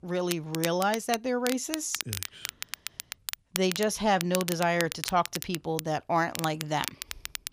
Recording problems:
crackle, like an old record; loud; 7 dB below the speech

